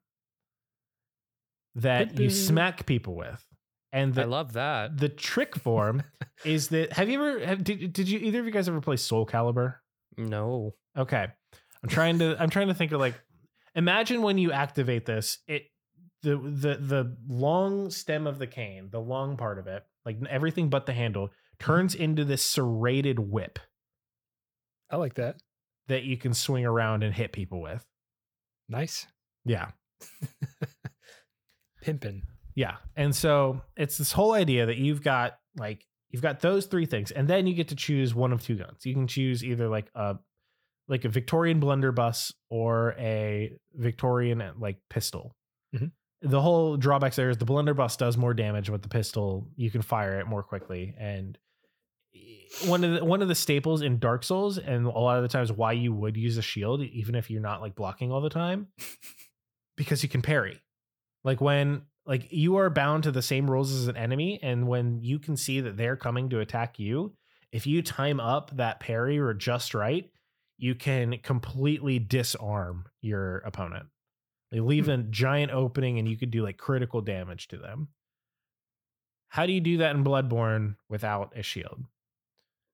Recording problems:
none

